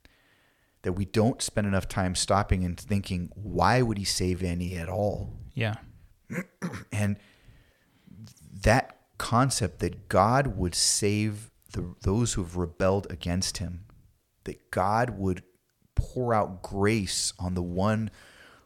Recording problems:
uneven, jittery; slightly; from 4.5 to 16 s

